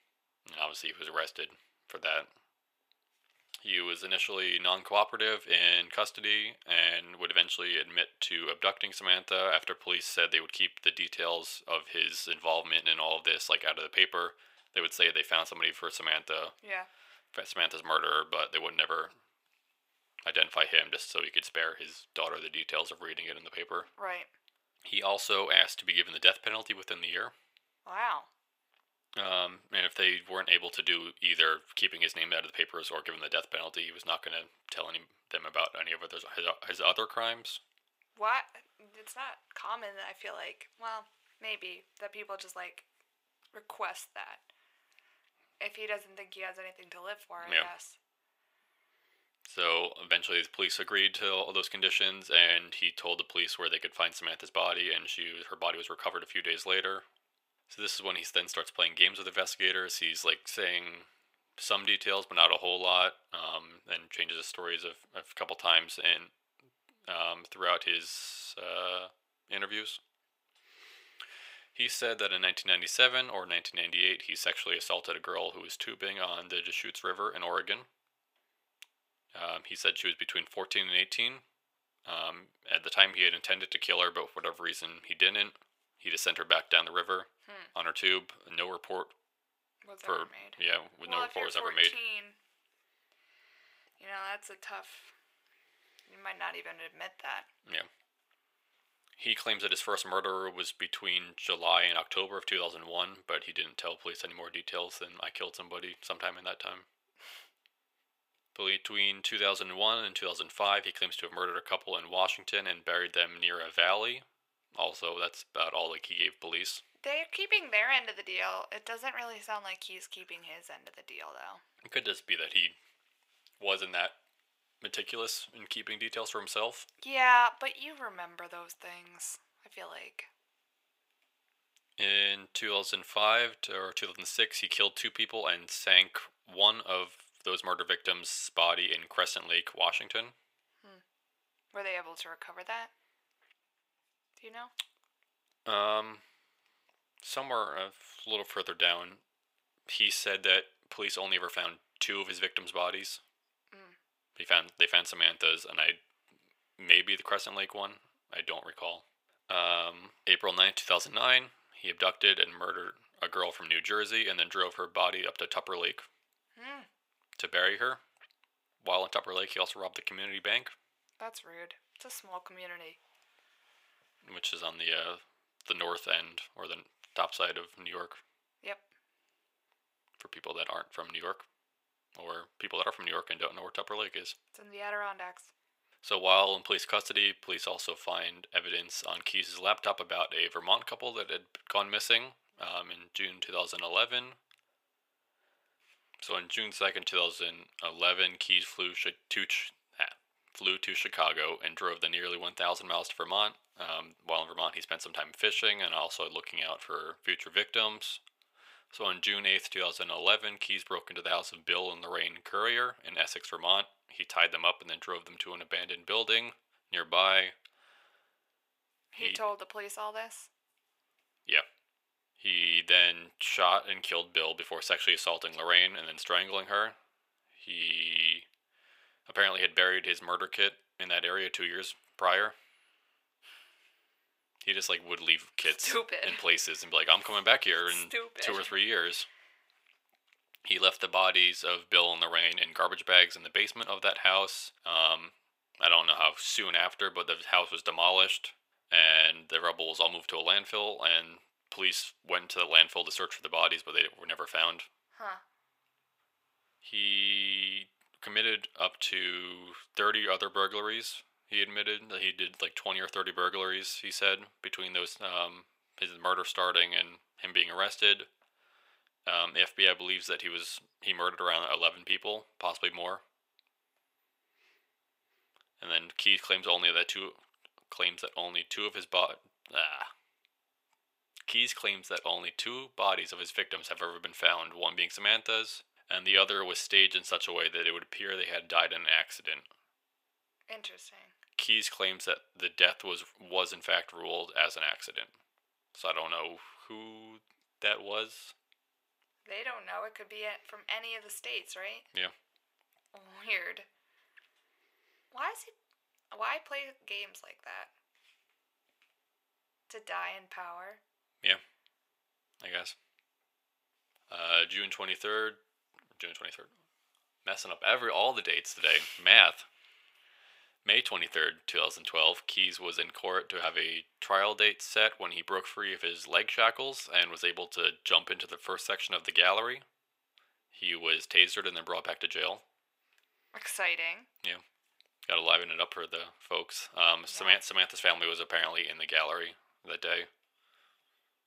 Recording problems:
thin; very; fading below 800 Hz

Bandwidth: 15.5 kHz